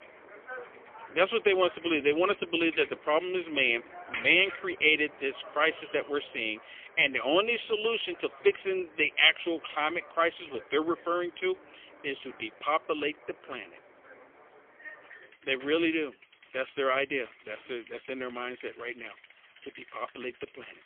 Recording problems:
phone-call audio; poor line; nothing above 3.5 kHz
traffic noise; faint; throughout; 20 dB below the speech

